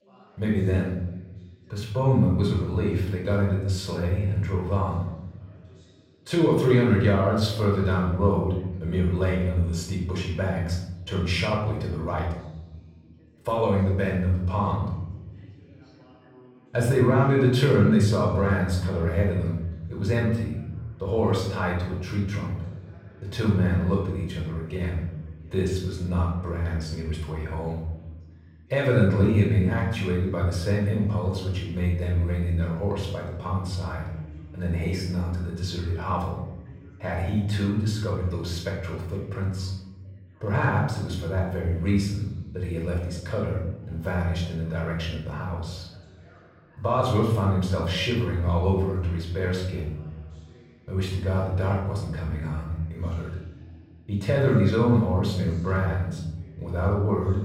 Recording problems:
off-mic speech; far
room echo; noticeable; dies away in 1 s
background chatter; faint; throughout; 2 voices, 25 dB below the speech

